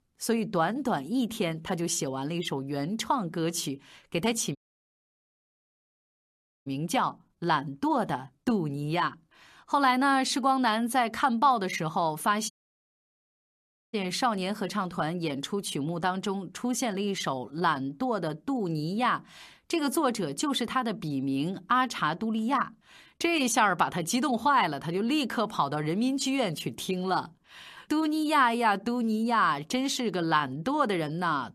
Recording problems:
audio cutting out; at 4.5 s for 2 s and at 13 s for 1.5 s

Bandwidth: 13.5 kHz